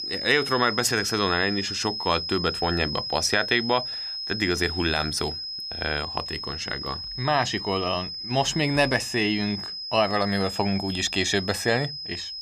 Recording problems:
high-pitched whine; loud; throughout; 5 kHz, 5 dB below the speech

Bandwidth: 15 kHz